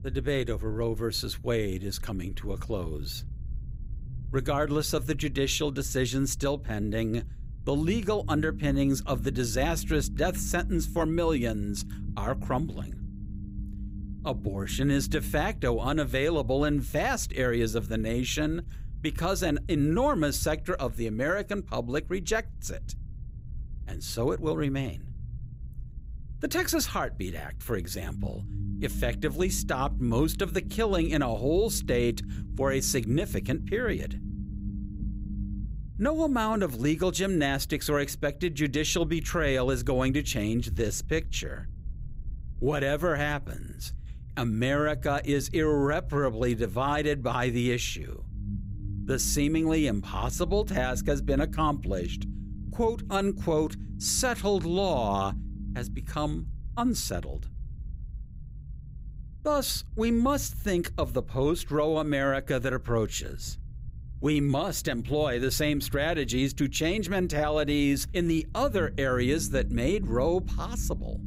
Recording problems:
low rumble; faint; throughout; 20 dB below the speech

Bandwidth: 15.5 kHz